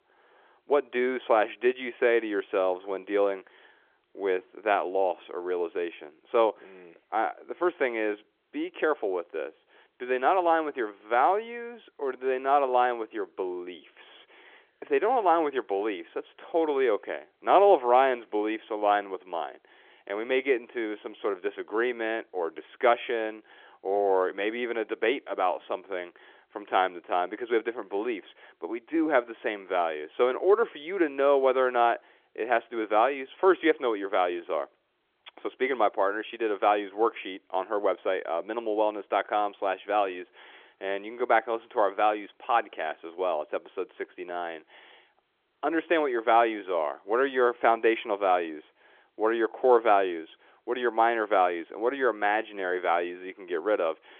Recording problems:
phone-call audio; nothing above 3.5 kHz

